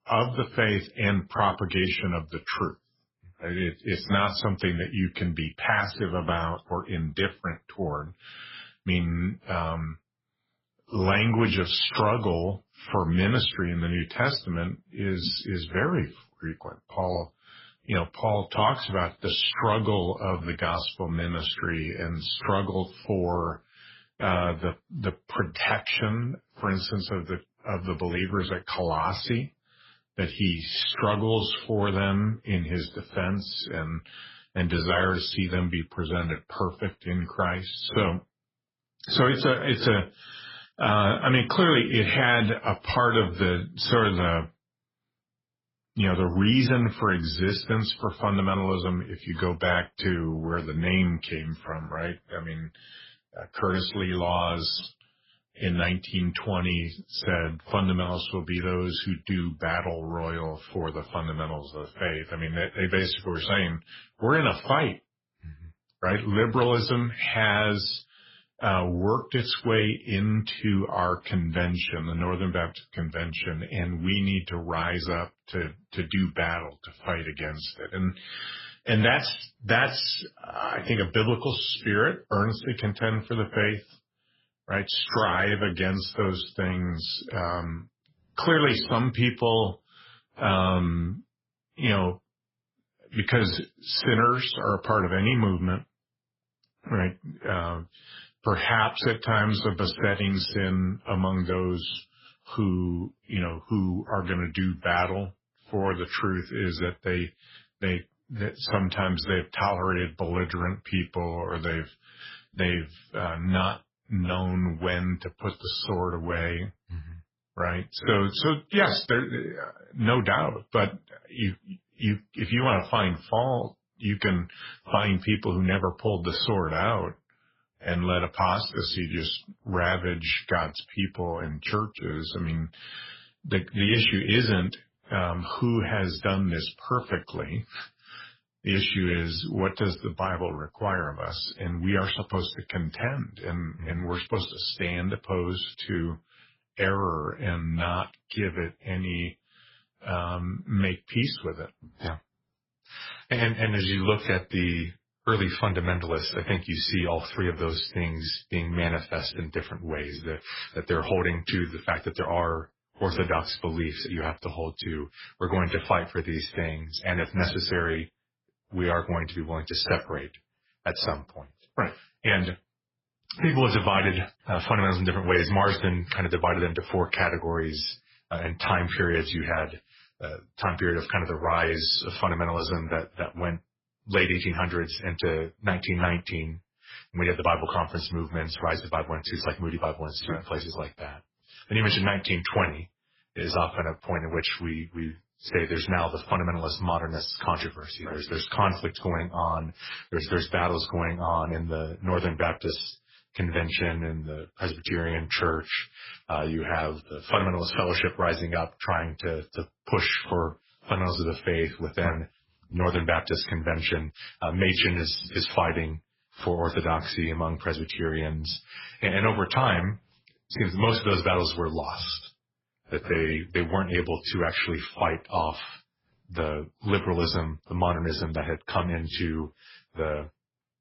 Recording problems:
garbled, watery; badly; nothing above 5.5 kHz

